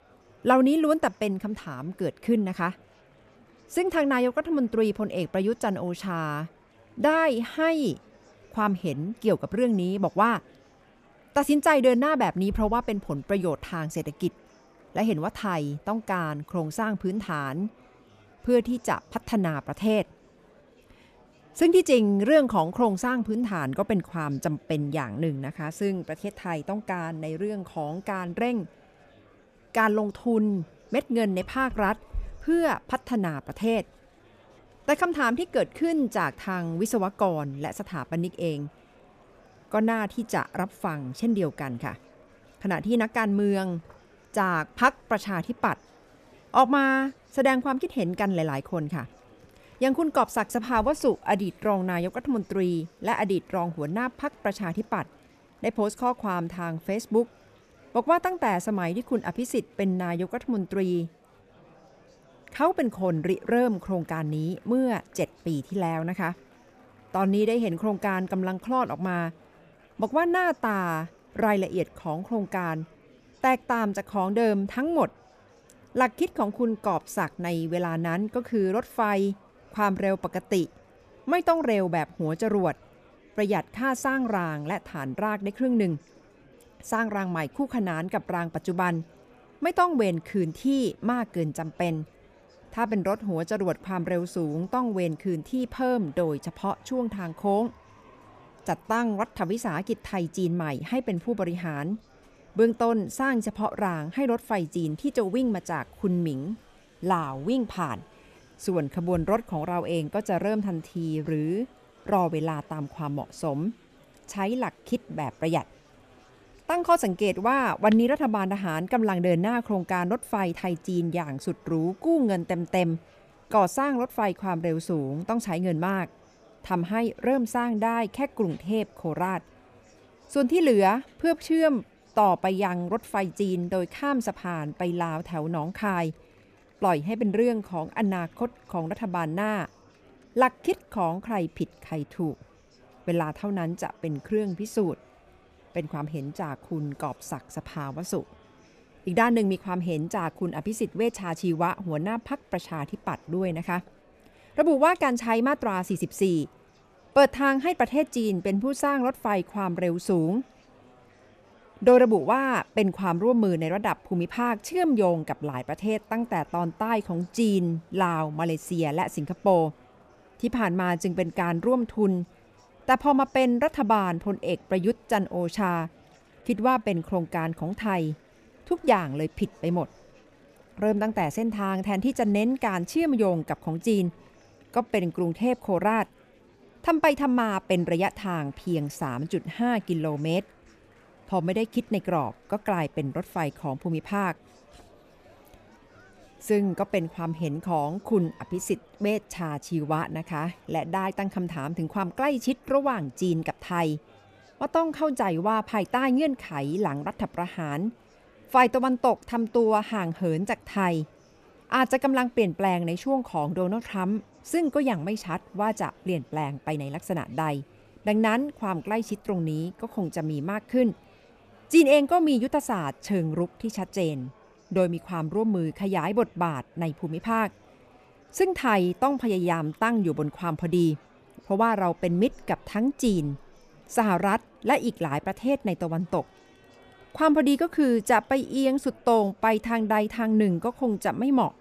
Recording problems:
murmuring crowd; faint; throughout; 30 dB below the speech

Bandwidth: 14.5 kHz